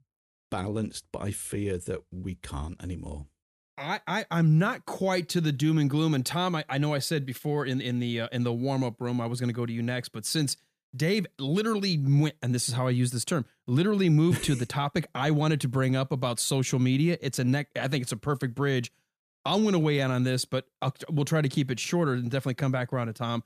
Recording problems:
none

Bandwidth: 14.5 kHz